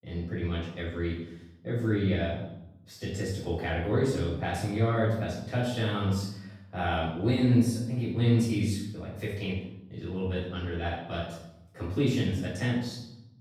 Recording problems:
off-mic speech; far
room echo; noticeable; dies away in 0.8 s

